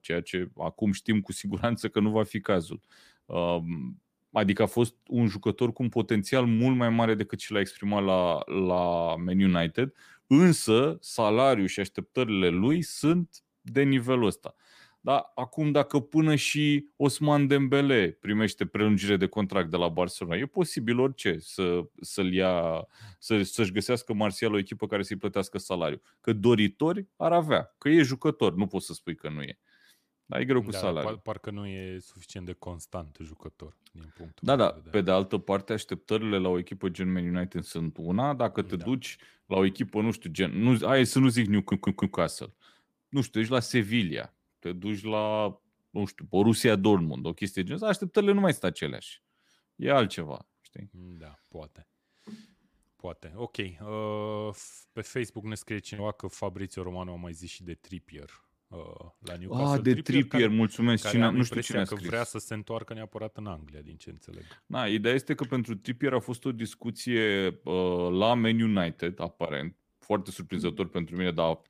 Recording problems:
audio stuttering; at 42 s

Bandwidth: 15 kHz